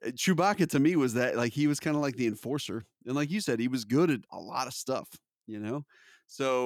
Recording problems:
abrupt cut into speech; at the end

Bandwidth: 19 kHz